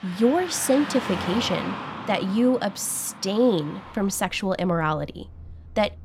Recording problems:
traffic noise; noticeable; throughout; 10 dB below the speech

